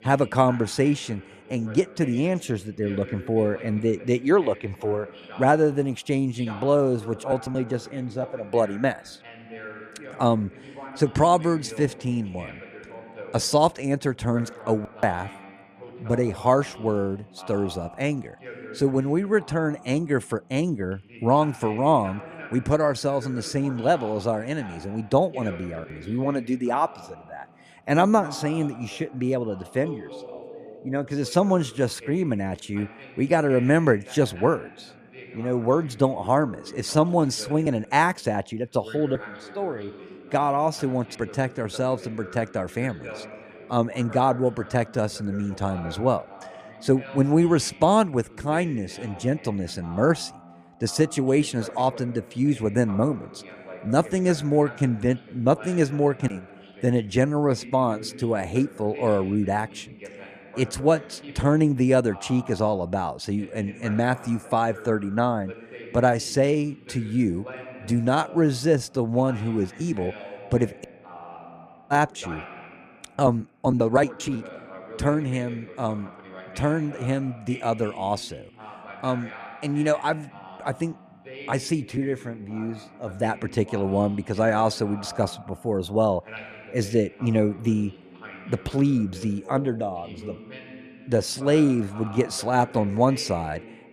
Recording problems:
voice in the background; noticeable; throughout; 20 dB below the speech

